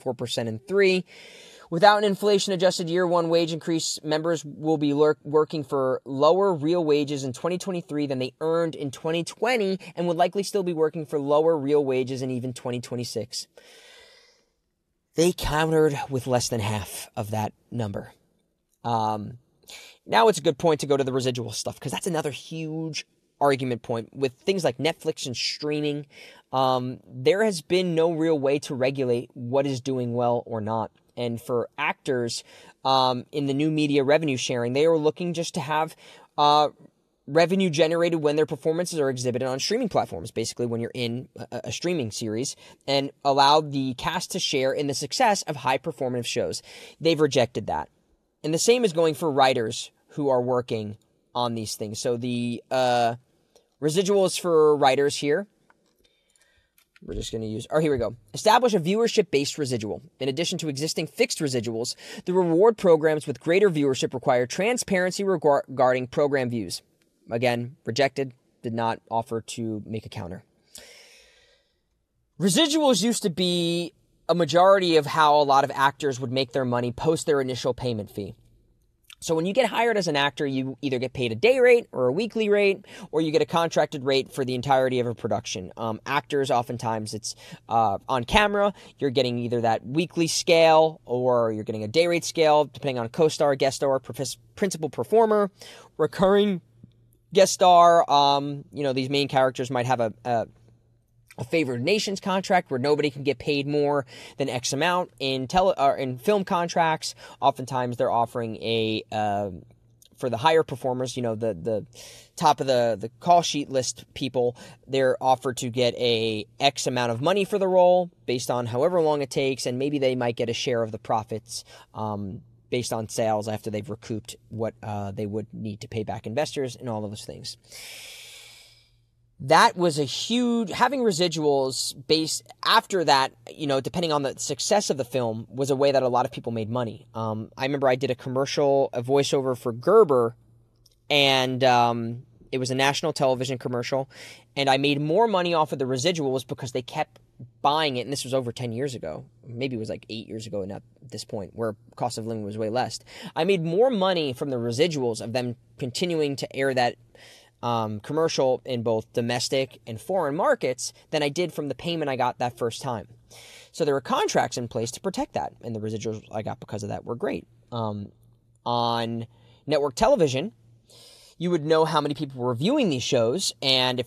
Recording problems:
none

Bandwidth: 14 kHz